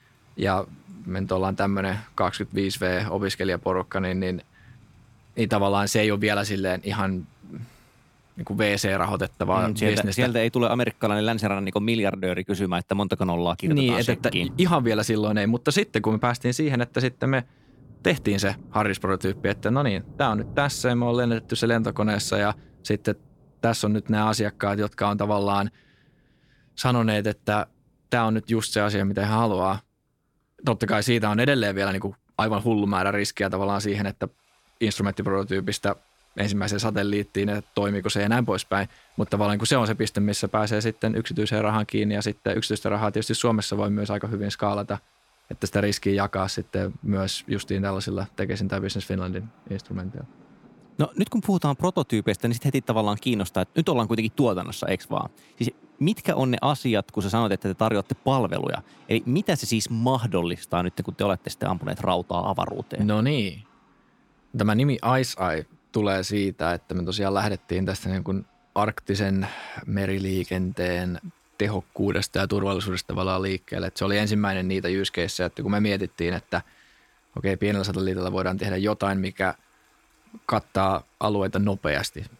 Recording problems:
rain or running water; faint; throughout; 25 dB below the speech

